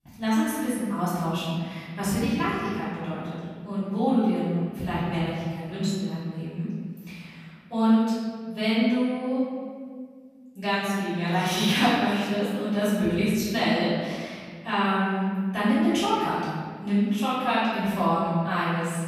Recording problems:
room echo; strong; dies away in 1.8 s
off-mic speech; far

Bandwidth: 14.5 kHz